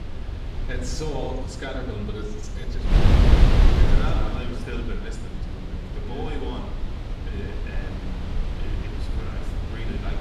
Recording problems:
off-mic speech; far
room echo; noticeable; dies away in 0.7 s
wind noise on the microphone; heavy; 1 dB above the speech
electrical hum; very faint; until 6 s; 60 Hz, 30 dB below the speech

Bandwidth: 14.5 kHz